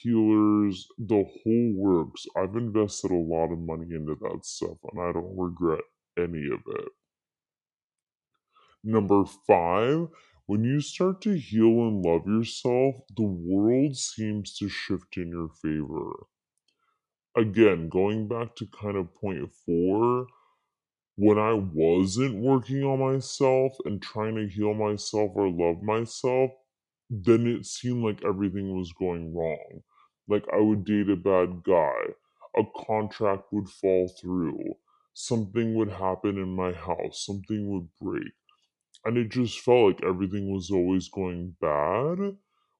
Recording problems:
wrong speed and pitch; too slow and too low; 0.7 times normal speed

